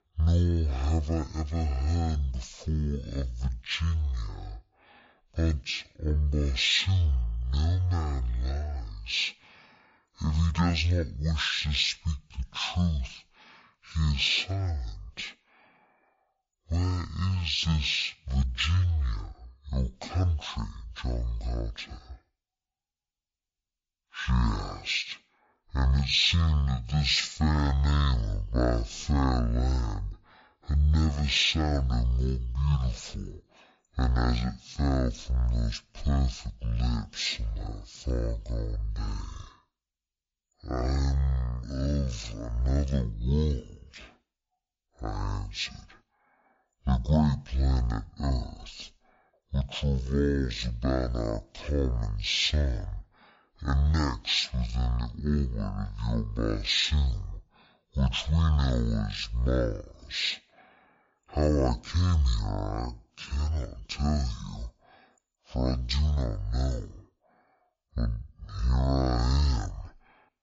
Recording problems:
wrong speed and pitch; too slow and too low; 0.5 times normal speed

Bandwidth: 7.5 kHz